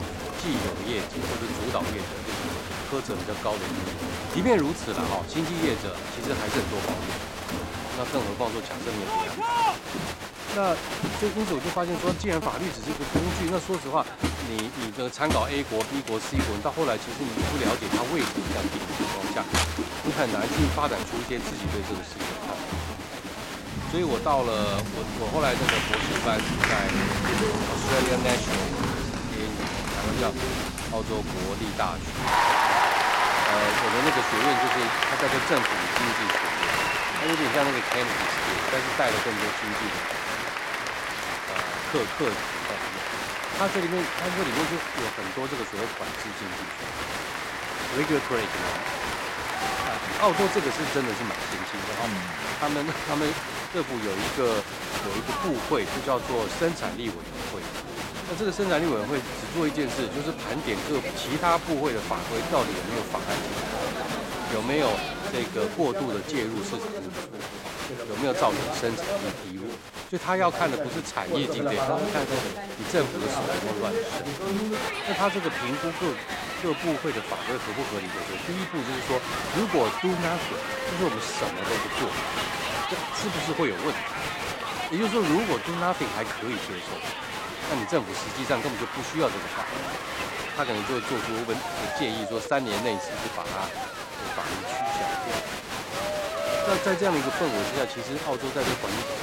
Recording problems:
crowd noise; very loud; throughout; 1 dB above the speech

